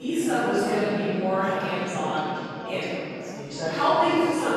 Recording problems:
room echo; strong; dies away in 2.2 s
off-mic speech; far
background chatter; loud; throughout; 2 voices, 8 dB below the speech
abrupt cut into speech; at the start and the end

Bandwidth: 13.5 kHz